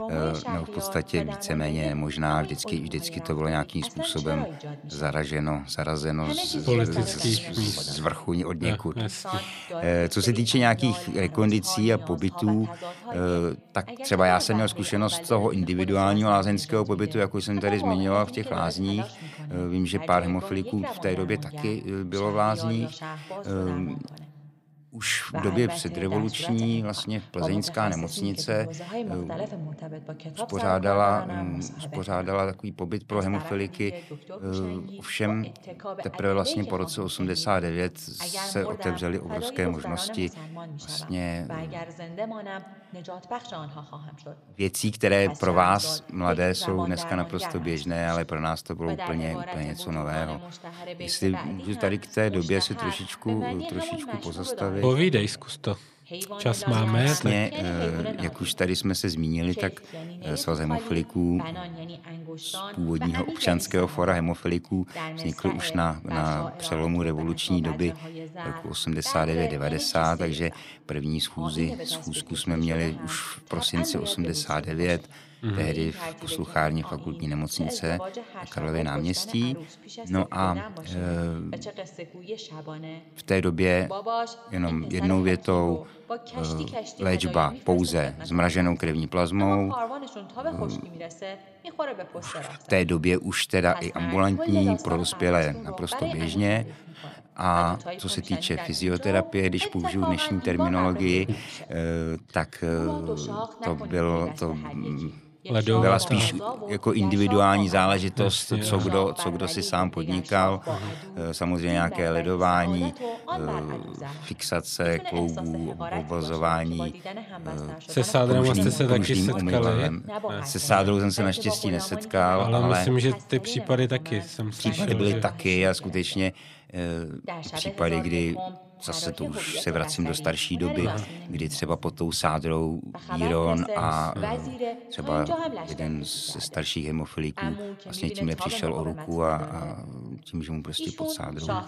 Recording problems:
voice in the background; noticeable; throughout; 10 dB below the speech

